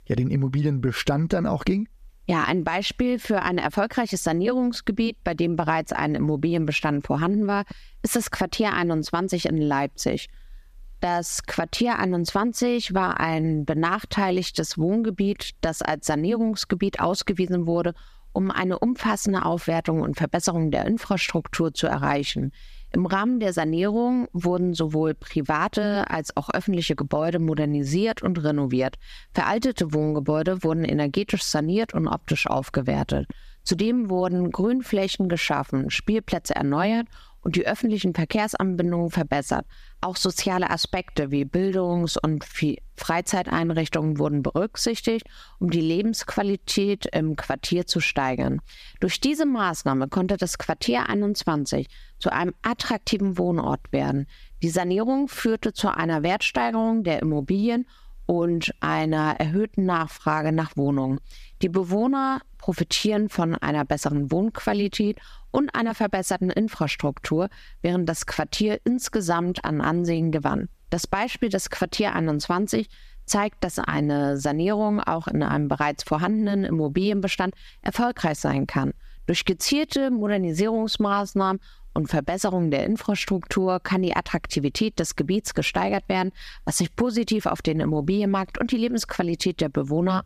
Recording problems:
squashed, flat; somewhat

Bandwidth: 14.5 kHz